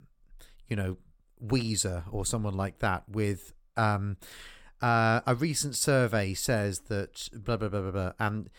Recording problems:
none

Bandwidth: 17 kHz